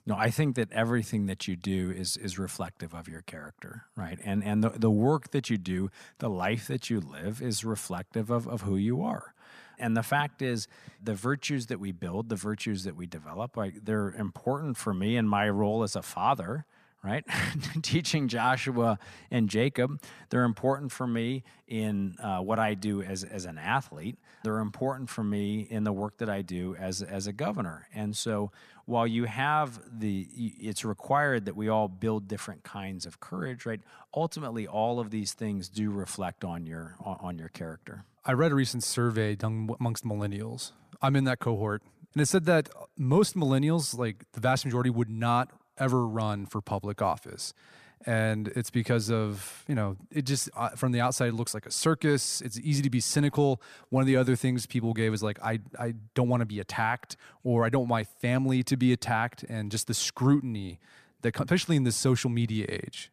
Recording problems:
none

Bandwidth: 14.5 kHz